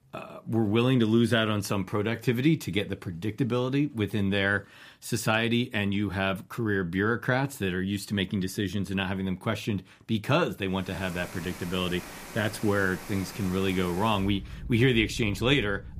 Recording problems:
rain or running water; noticeable; from 11 s on; 15 dB below the speech

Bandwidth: 15 kHz